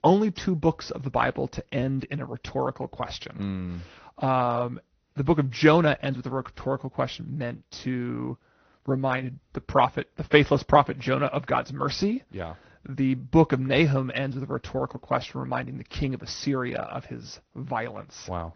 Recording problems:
high frequencies cut off; noticeable; nothing above 6 kHz
garbled, watery; slightly

